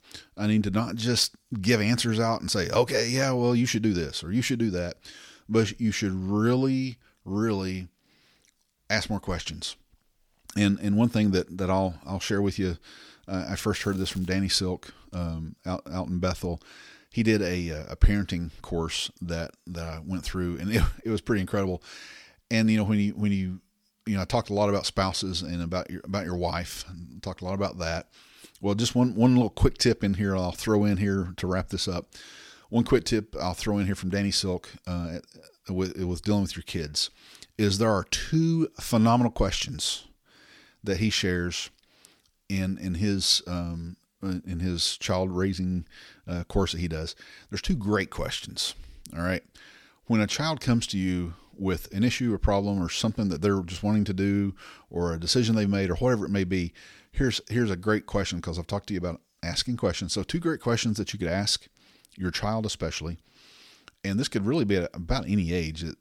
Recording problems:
crackling; faint; at 14 s; 25 dB below the speech

